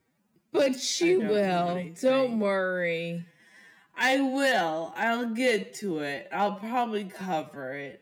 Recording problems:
wrong speed, natural pitch; too slow; 0.5 times normal speed

